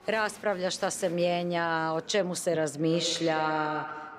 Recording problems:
echo of what is said; strong; from 3 s on; 100 ms later, 8 dB below the speech
murmuring crowd; faint; throughout; 20 dB below the speech

